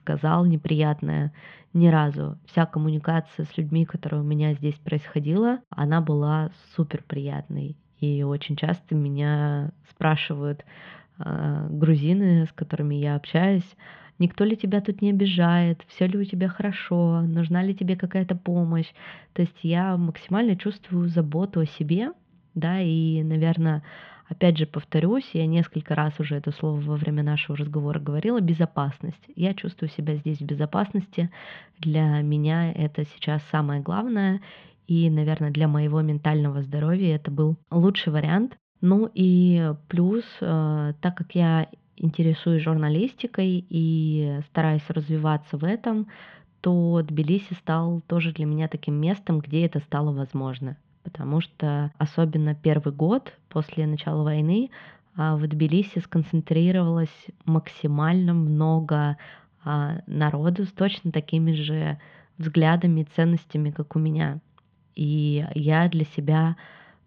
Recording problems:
muffled; very; fading above 3.5 kHz

